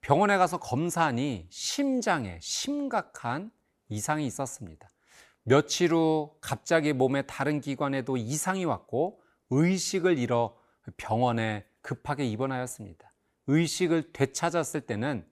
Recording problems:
none

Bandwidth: 15 kHz